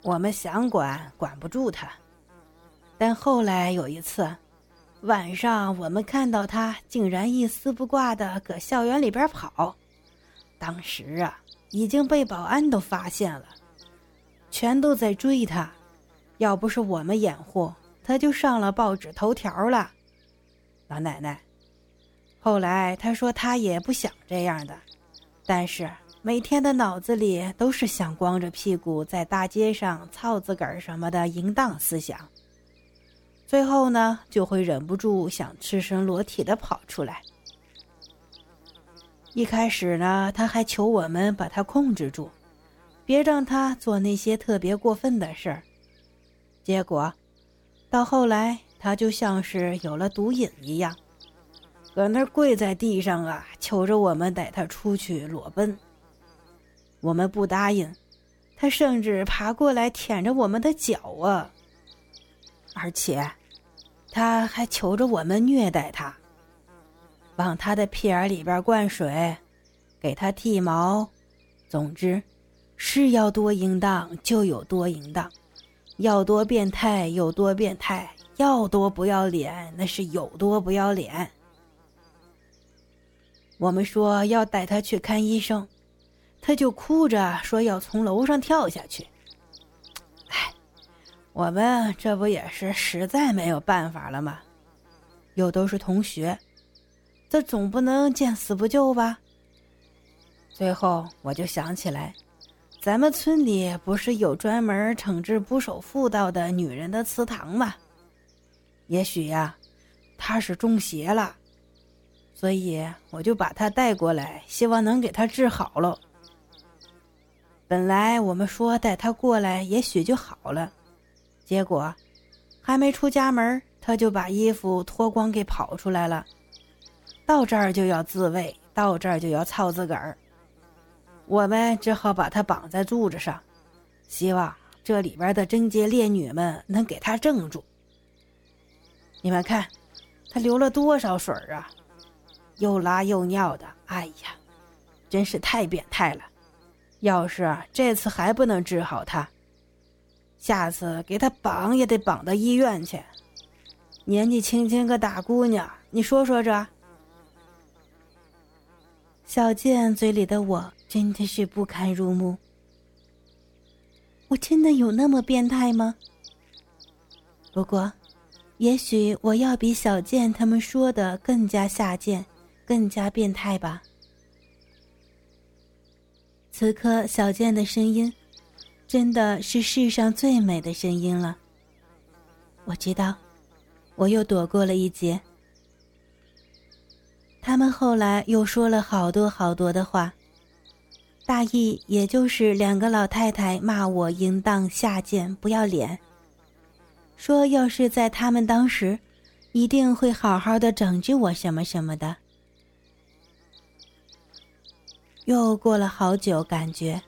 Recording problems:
electrical hum; faint; throughout; 60 Hz, 30 dB below the speech

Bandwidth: 17 kHz